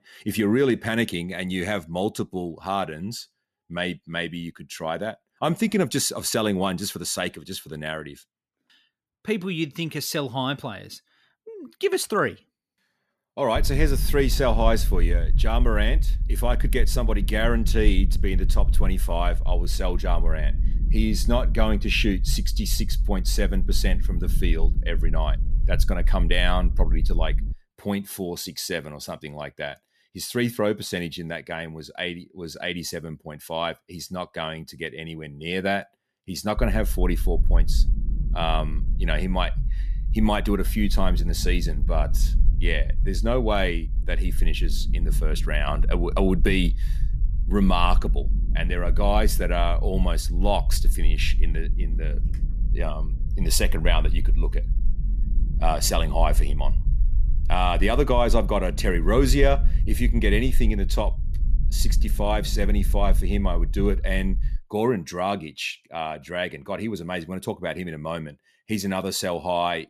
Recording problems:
low rumble; noticeable; from 14 to 28 s and from 37 s to 1:05; 20 dB below the speech

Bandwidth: 14.5 kHz